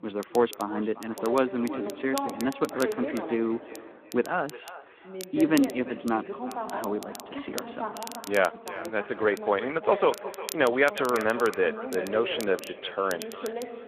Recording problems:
echo of what is said; noticeable; throughout; 360 ms later, 15 dB below the speech
phone-call audio
voice in the background; loud; throughout; 10 dB below the speech
crackle, like an old record; noticeable; 15 dB below the speech

